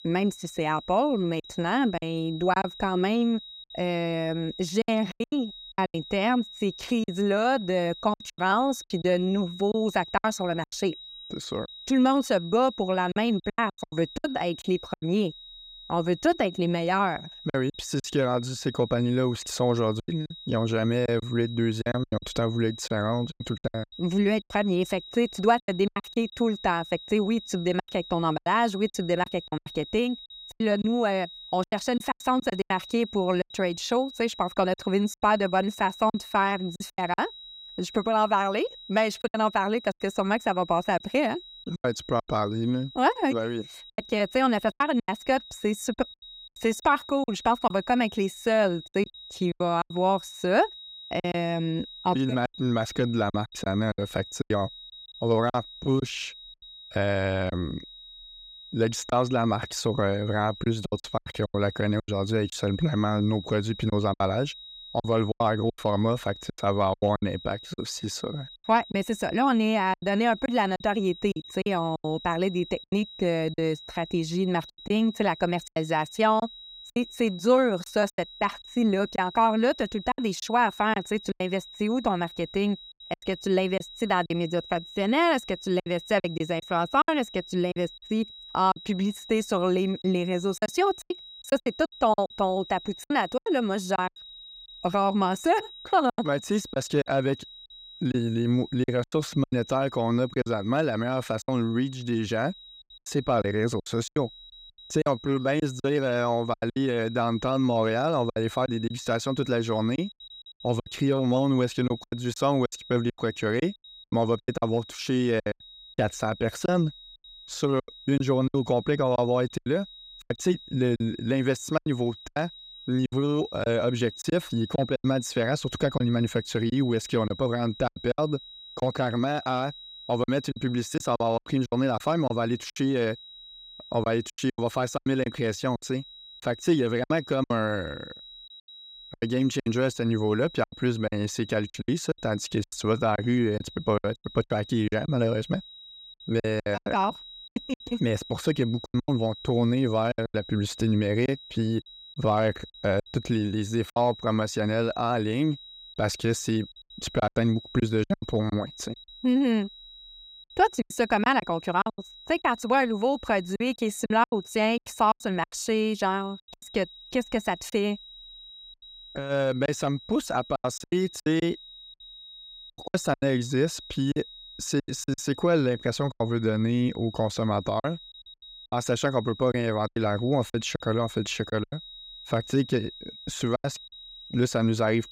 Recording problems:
high-pitched whine; noticeable; throughout; 4 kHz, 15 dB below the speech
choppy; very; 10% of the speech affected

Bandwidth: 15.5 kHz